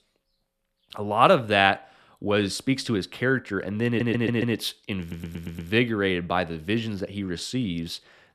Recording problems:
audio stuttering; at 4 s and at 5 s

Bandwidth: 13.5 kHz